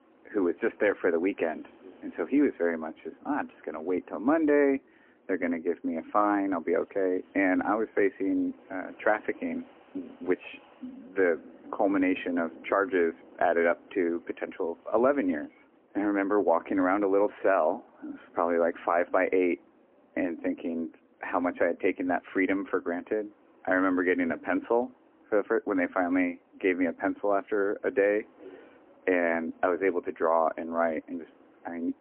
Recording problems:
phone-call audio; poor line
wind in the background; faint; throughout; 30 dB below the speech

